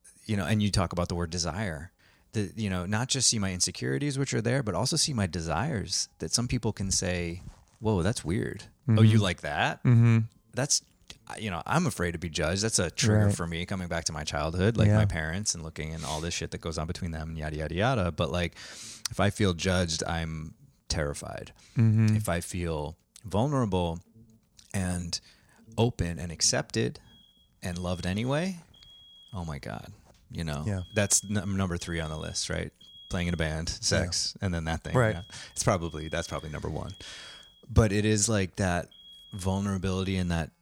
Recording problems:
alarms or sirens; faint; throughout; 25 dB below the speech

